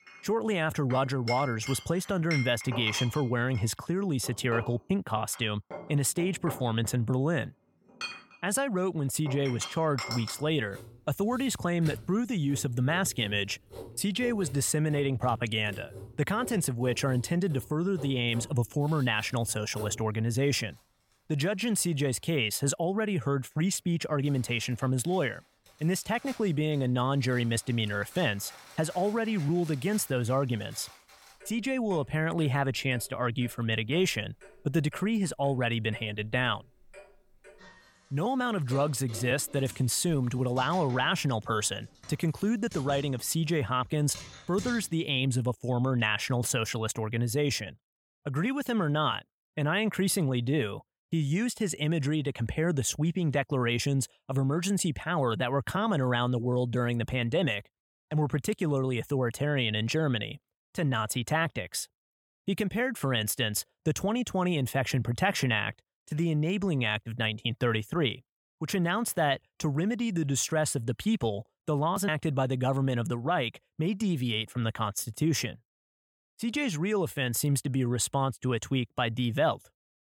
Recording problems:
household noises; noticeable; until 45 s; 15 dB below the speech

